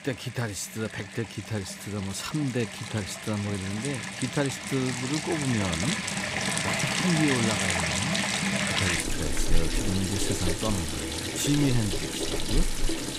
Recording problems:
household noises; very loud; throughout; 2 dB above the speech

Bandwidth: 15.5 kHz